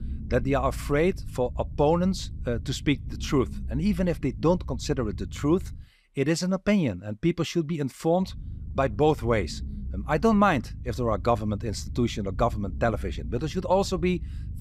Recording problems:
low rumble; faint; until 6 s and from 8.5 s on; 25 dB below the speech

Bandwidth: 15 kHz